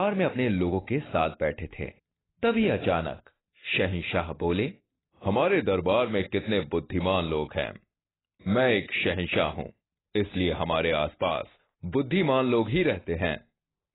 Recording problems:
garbled, watery; badly; nothing above 4 kHz
abrupt cut into speech; at the start

